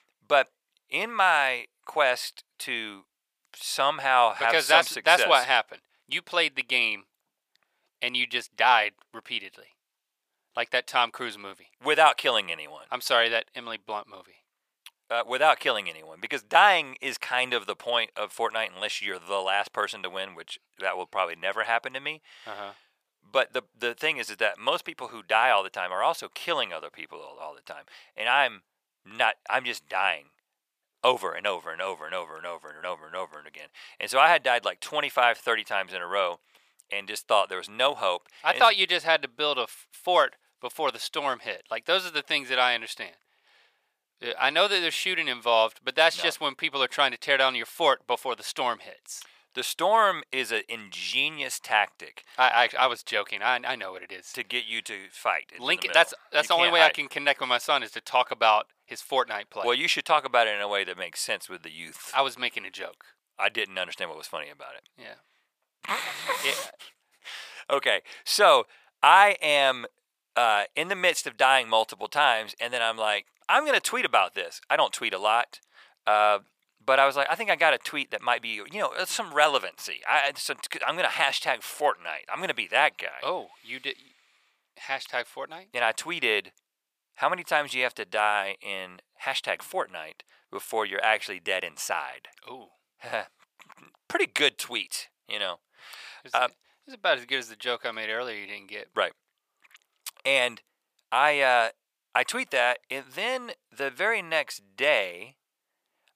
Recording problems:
thin; very; fading below 750 Hz

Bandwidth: 15 kHz